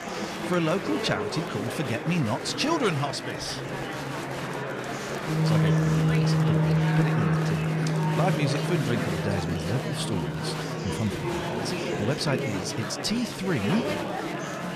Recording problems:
background music; very loud; throughout; 3 dB above the speech
murmuring crowd; loud; throughout; 1 dB below the speech
crackle, like an old record; faint; 25 dB below the speech

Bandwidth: 14.5 kHz